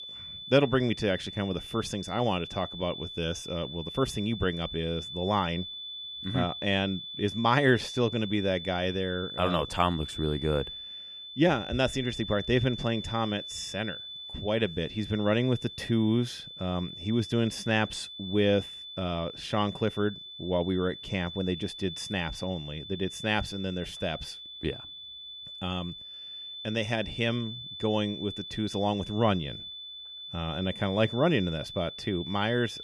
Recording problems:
high-pitched whine; loud; throughout; 3.5 kHz, 9 dB below the speech

